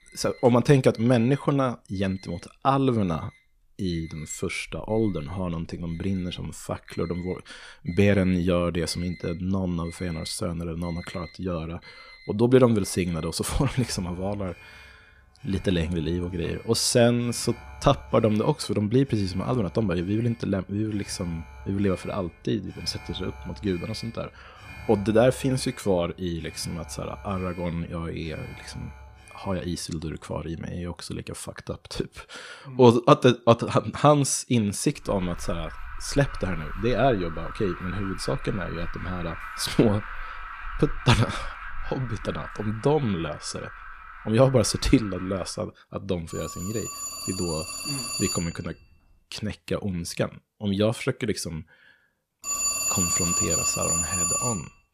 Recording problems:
alarms or sirens; loud; throughout; 6 dB below the speech

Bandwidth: 14.5 kHz